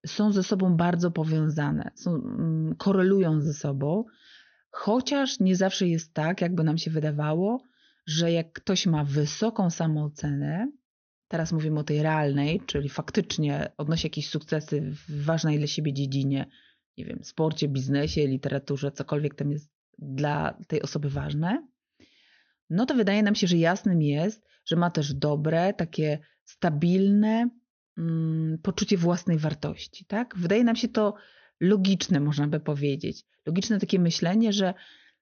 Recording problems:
high frequencies cut off; noticeable; nothing above 6.5 kHz

